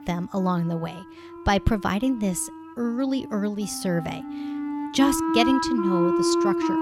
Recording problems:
background music; very loud; throughout; as loud as the speech

